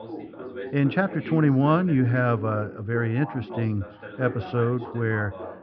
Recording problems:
muffled; very; fading above 3 kHz
high frequencies cut off; noticeable; nothing above 5.5 kHz
background chatter; noticeable; throughout; 2 voices, 15 dB below the speech

